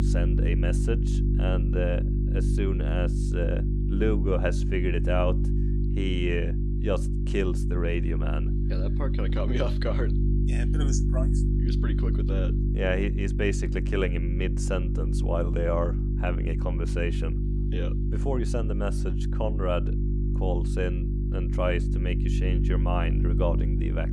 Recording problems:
electrical hum; loud; throughout; 50 Hz, 6 dB below the speech

